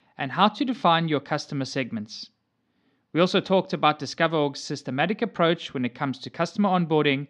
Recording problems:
none

